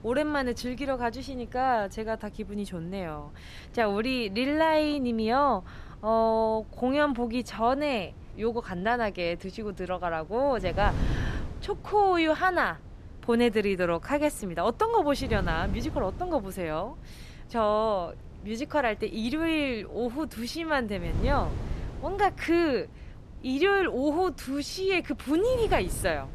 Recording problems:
wind noise on the microphone; occasional gusts; 20 dB below the speech

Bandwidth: 13.5 kHz